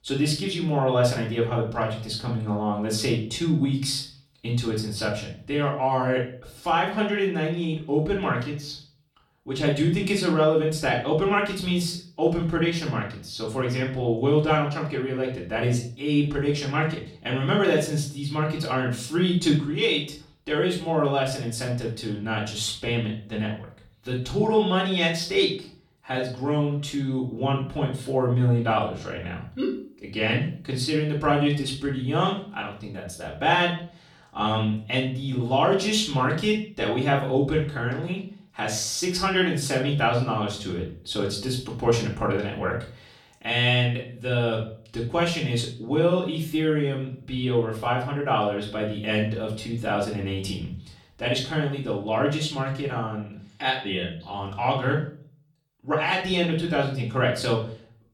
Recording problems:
off-mic speech; far
room echo; slight; dies away in 0.4 s

